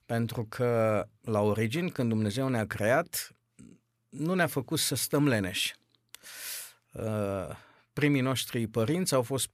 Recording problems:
none

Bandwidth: 14.5 kHz